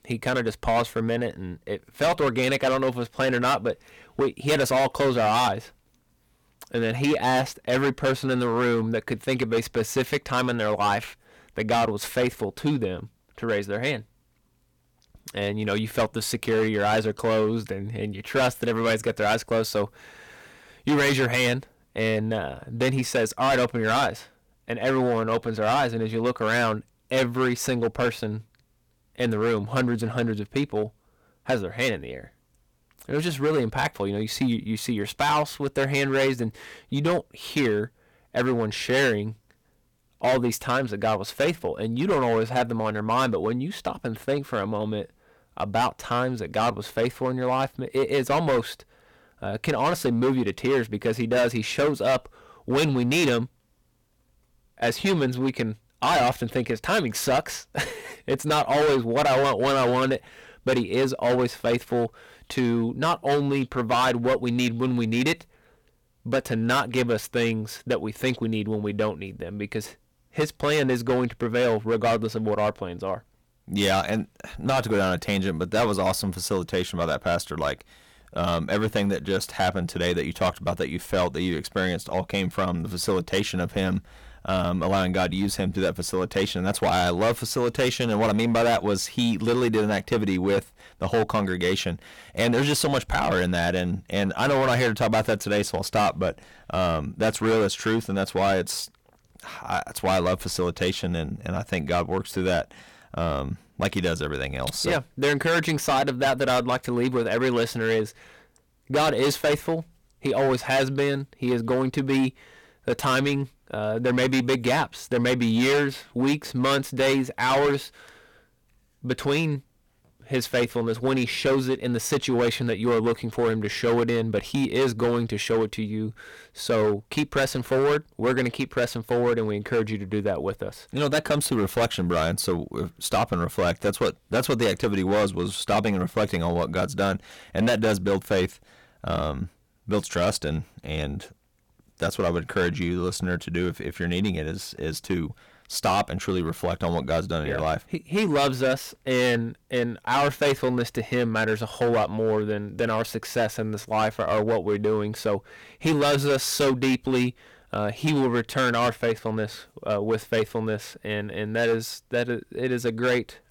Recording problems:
distortion; heavy; 10% of the sound clipped

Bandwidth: 18 kHz